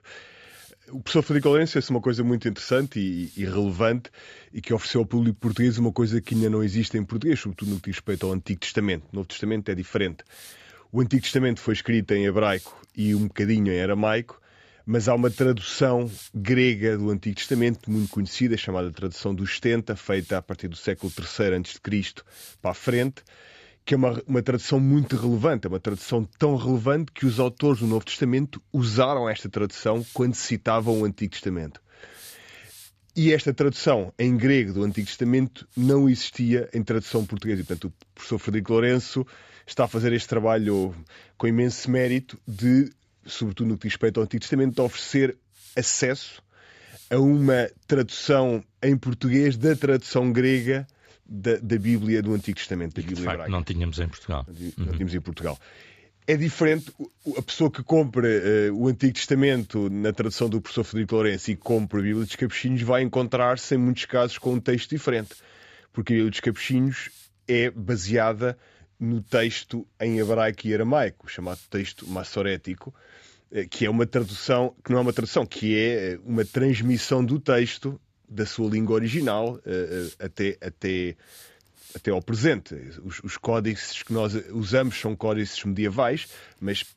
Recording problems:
high frequencies cut off; noticeable; nothing above 8 kHz
hiss; faint; throughout; 25 dB below the speech

